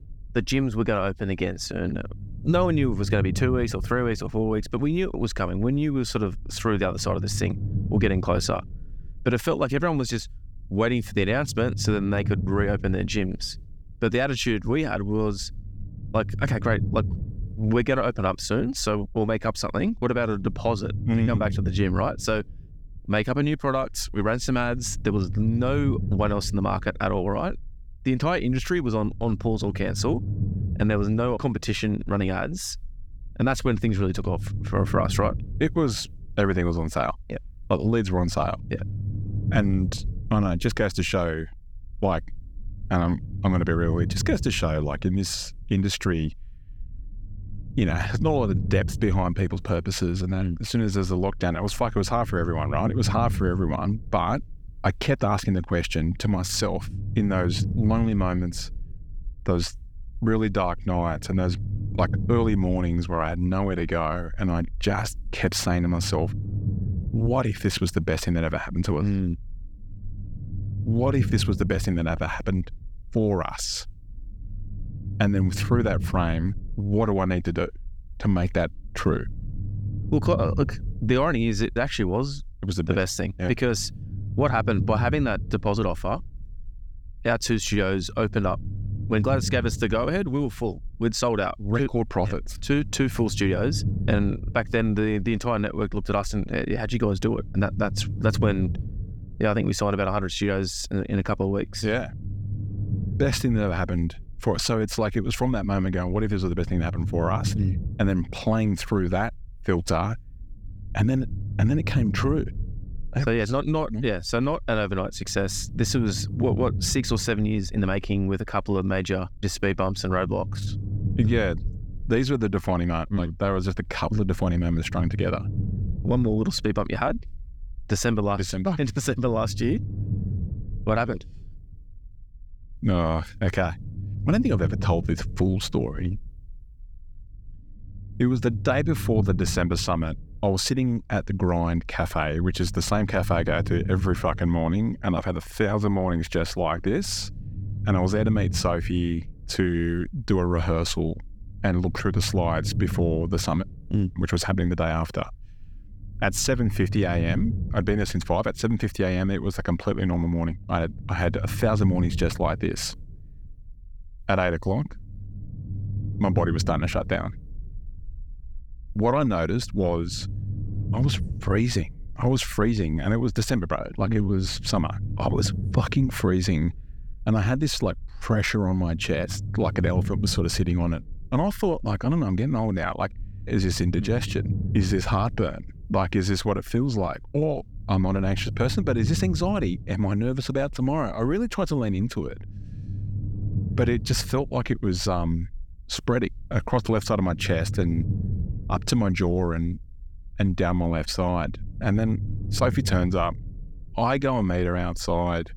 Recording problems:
low rumble; noticeable; throughout; 15 dB below the speech

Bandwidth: 18 kHz